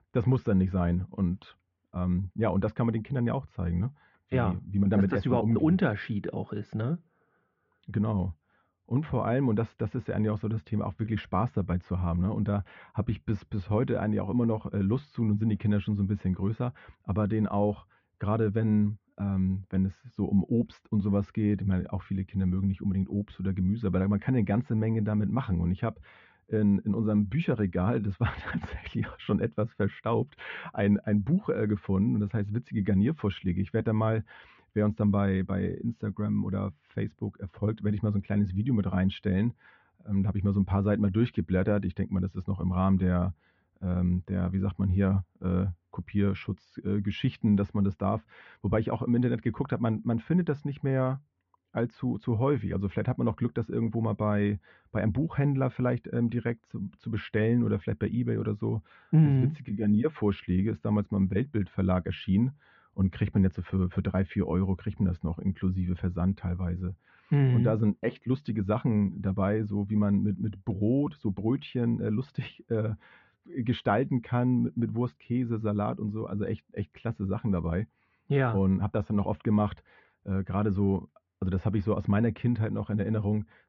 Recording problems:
muffled; very slightly; fading above 2.5 kHz
high frequencies cut off; slight; nothing above 7 kHz

